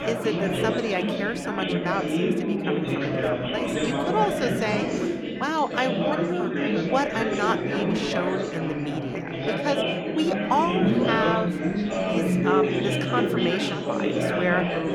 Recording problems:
chatter from many people; very loud; throughout; 3 dB above the speech

